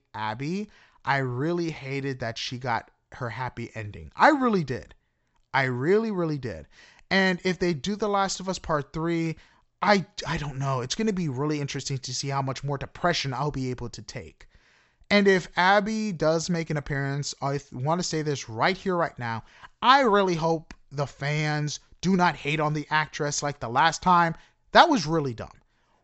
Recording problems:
high frequencies cut off; noticeable; nothing above 8 kHz

